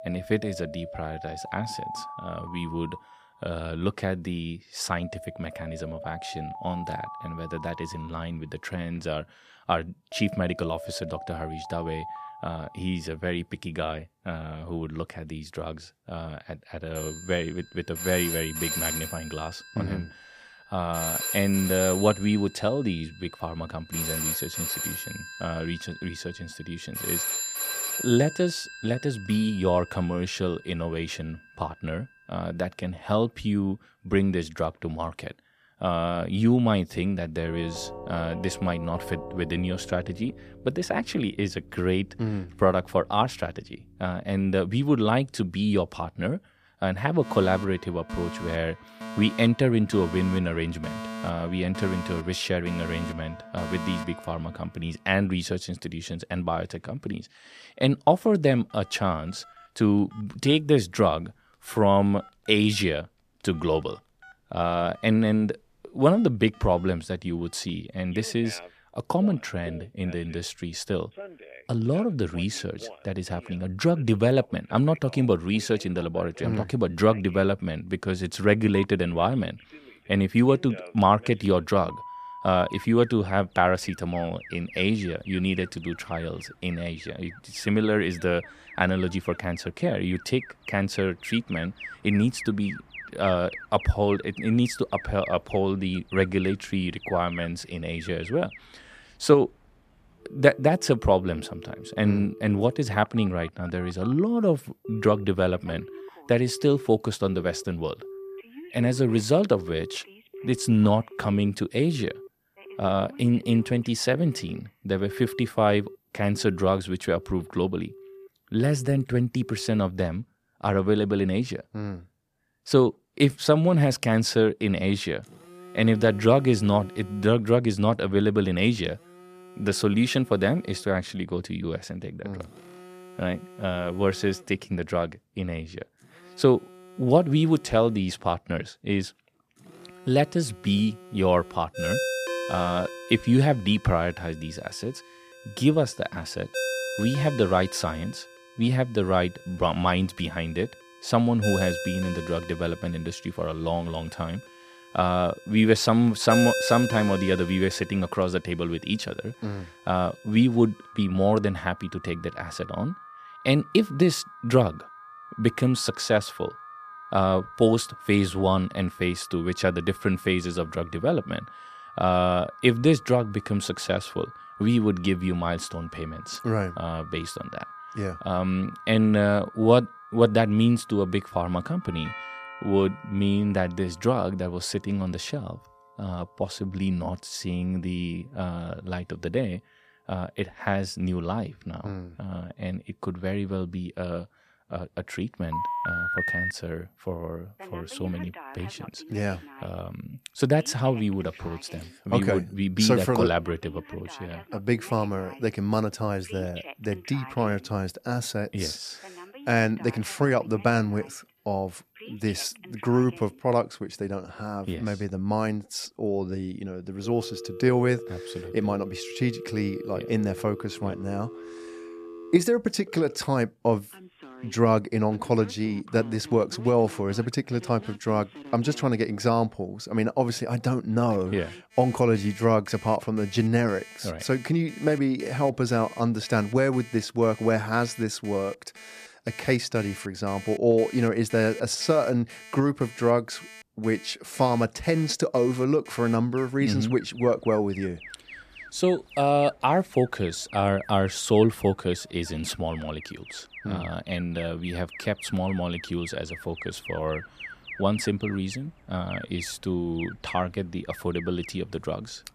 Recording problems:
alarms or sirens; noticeable; throughout; 15 dB below the speech

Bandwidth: 14.5 kHz